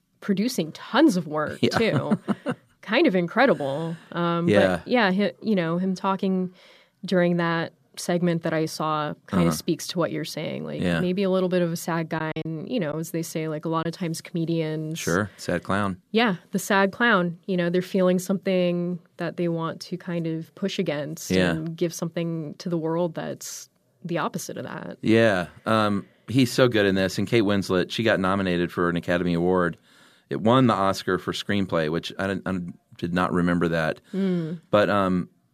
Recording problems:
choppy; occasionally; from 12 to 14 s; 4% of the speech affected

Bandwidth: 14.5 kHz